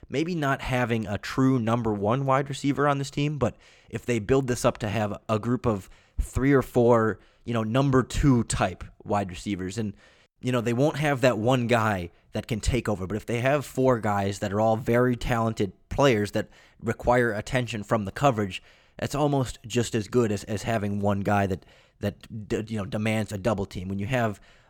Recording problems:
none

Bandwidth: 18 kHz